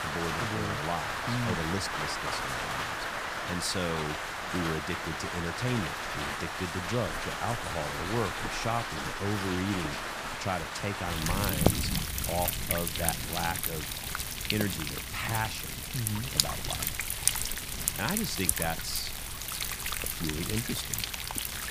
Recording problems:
rain or running water; very loud; throughout; 3 dB above the speech

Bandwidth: 15 kHz